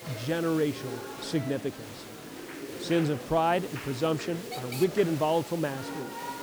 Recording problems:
murmuring crowd; noticeable; throughout; 10 dB below the speech
hiss; noticeable; throughout; 15 dB below the speech

